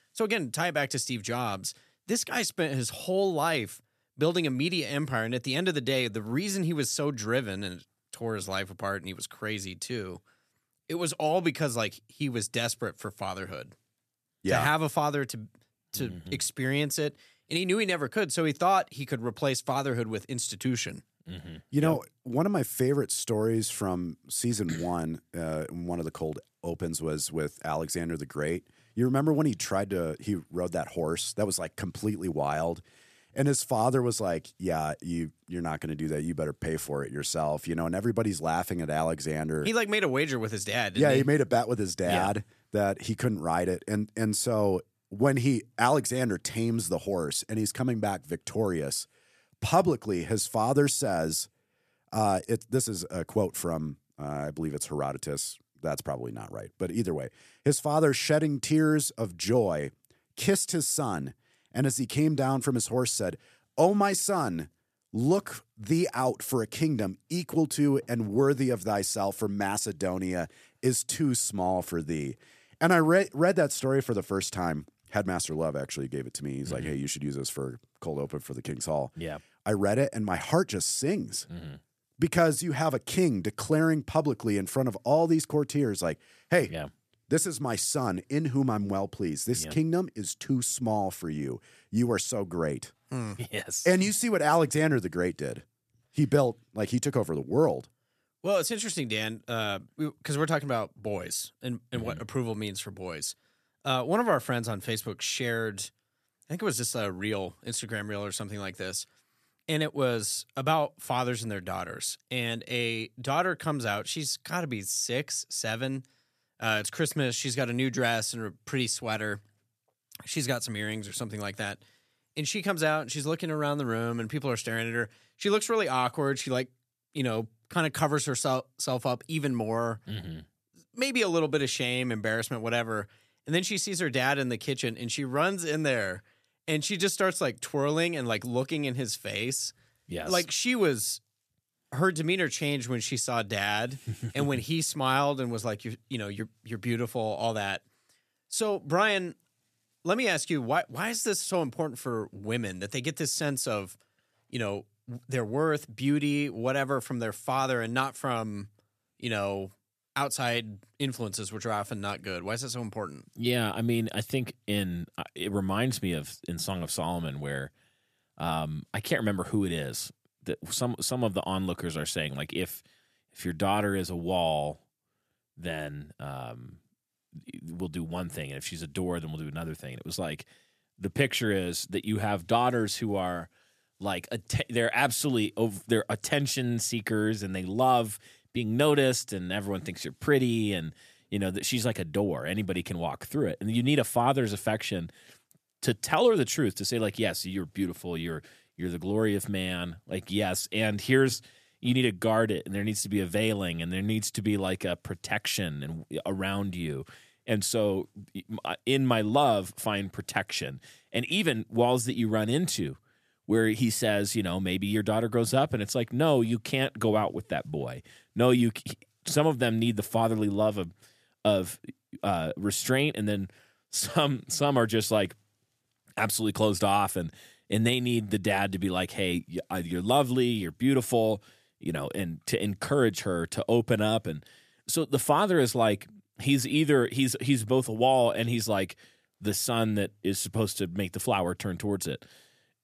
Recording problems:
none

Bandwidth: 14.5 kHz